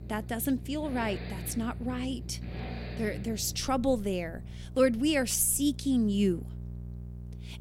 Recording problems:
traffic noise; noticeable; until 5.5 s; 15 dB below the speech
electrical hum; faint; throughout; 60 Hz, 20 dB below the speech

